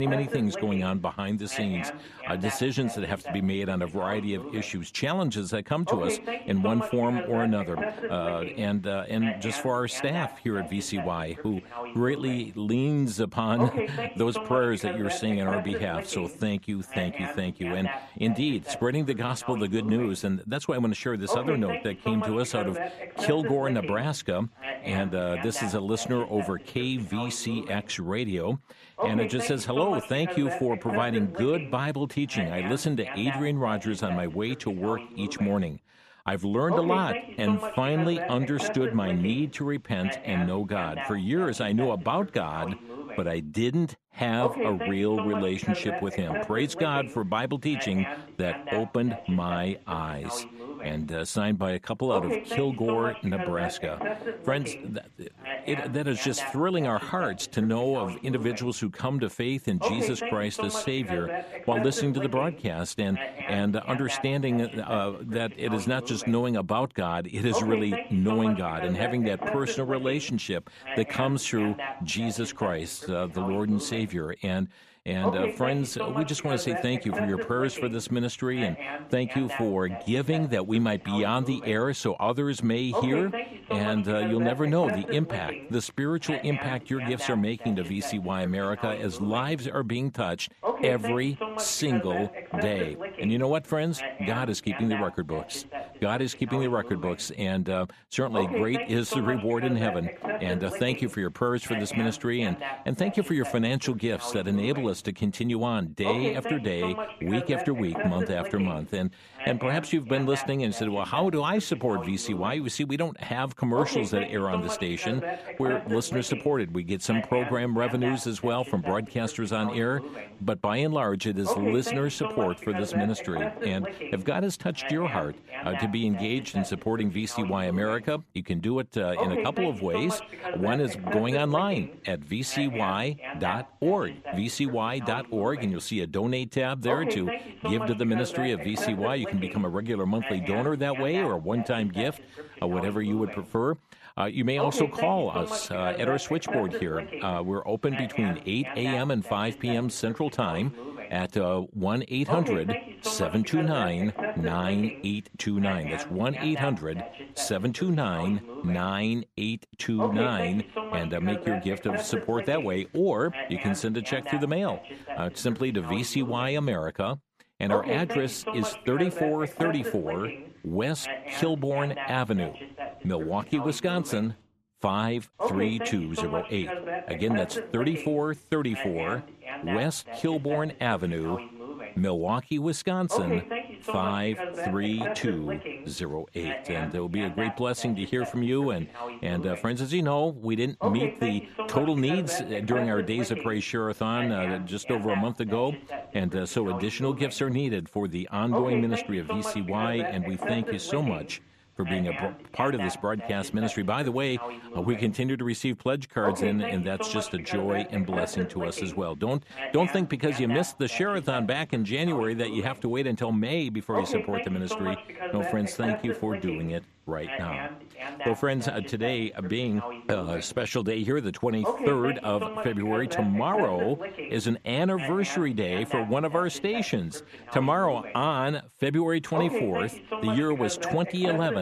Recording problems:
voice in the background; loud; throughout; 7 dB below the speech
abrupt cut into speech; at the start and the end

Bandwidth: 14 kHz